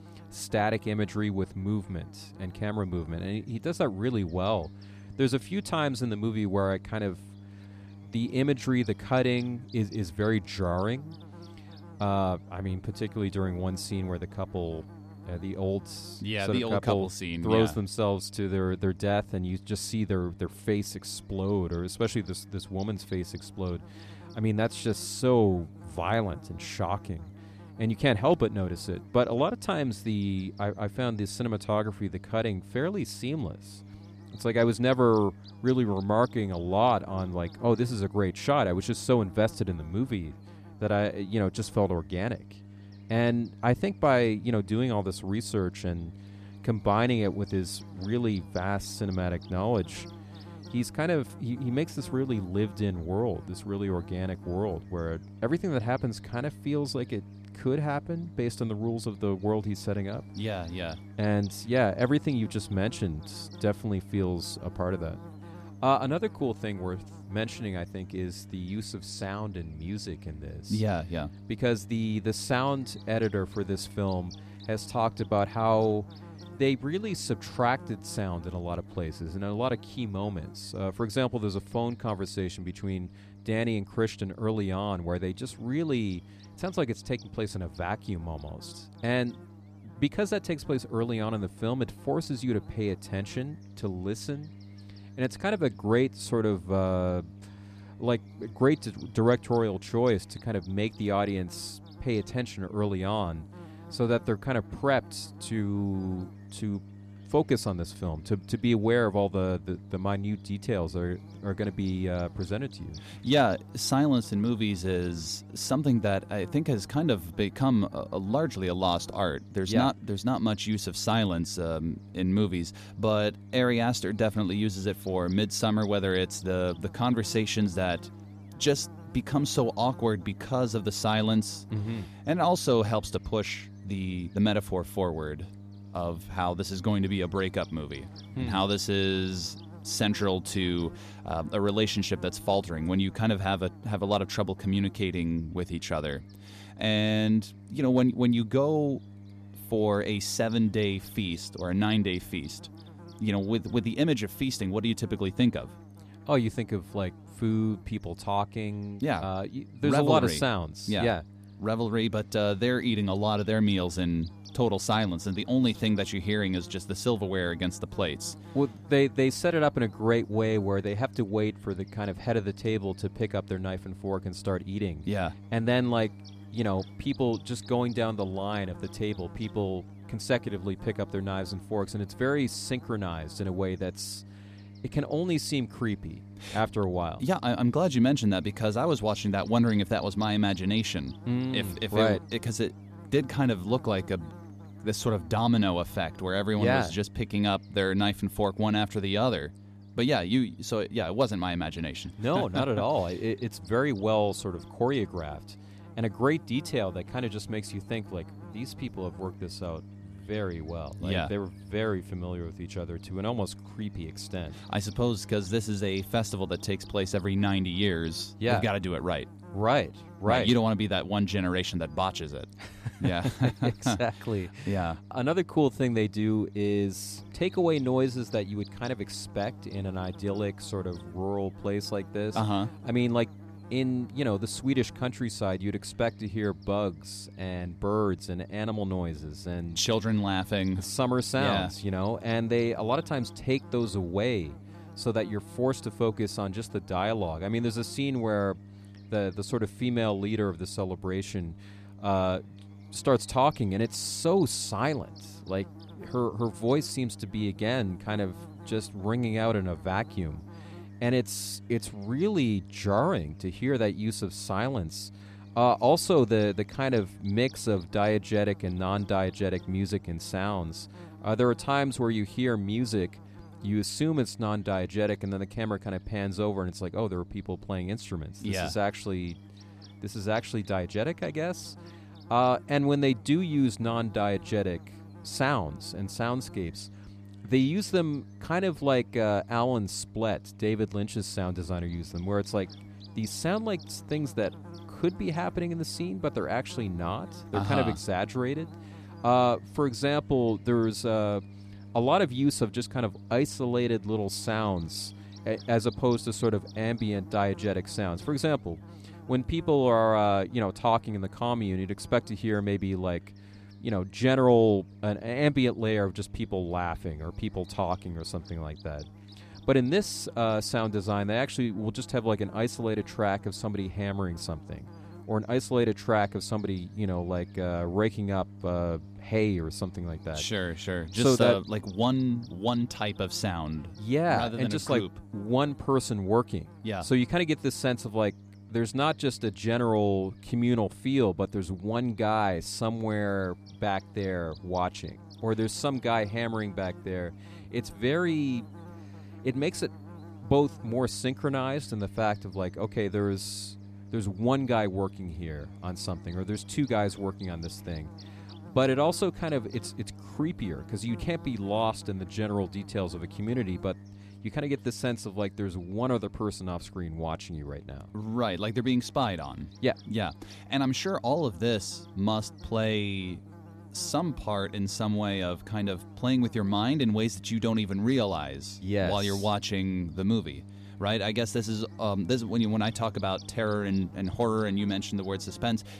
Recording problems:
electrical hum; faint; throughout; 50 Hz, 20 dB below the speech

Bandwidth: 14.5 kHz